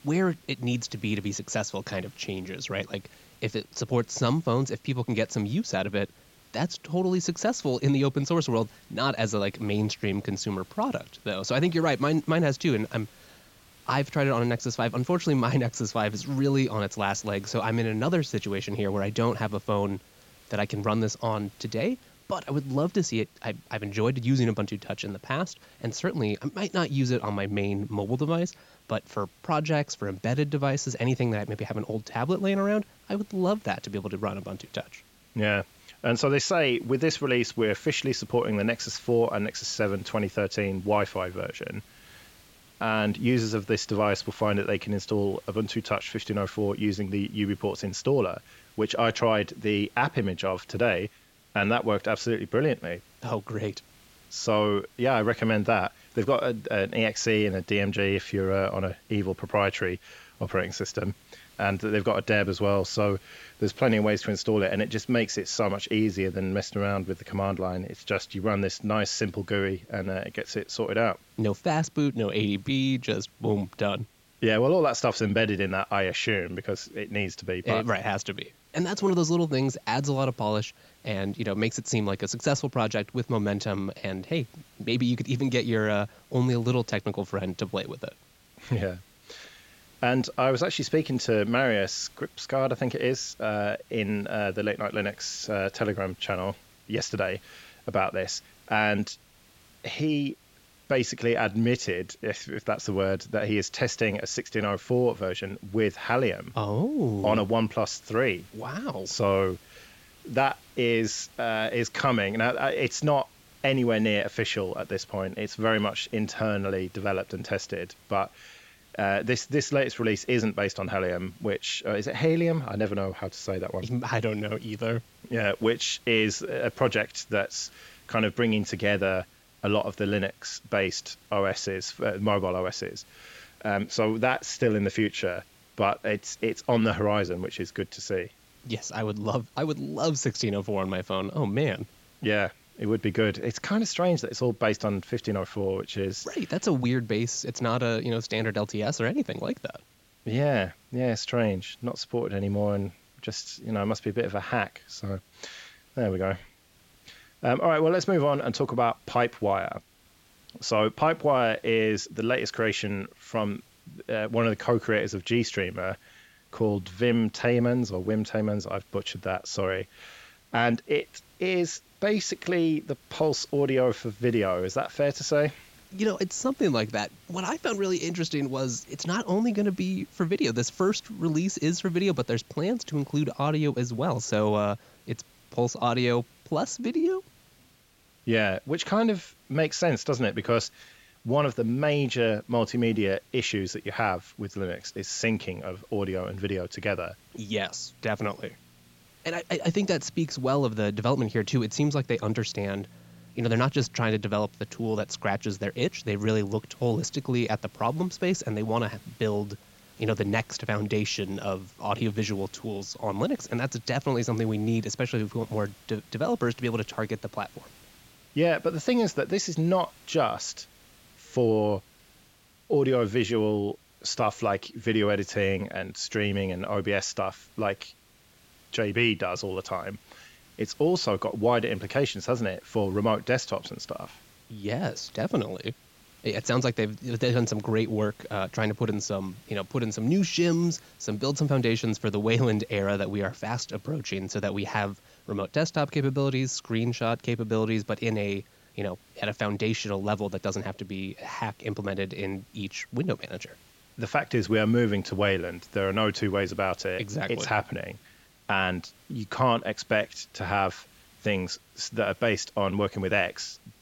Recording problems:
high frequencies cut off; noticeable; nothing above 8 kHz
hiss; faint; throughout; 30 dB below the speech

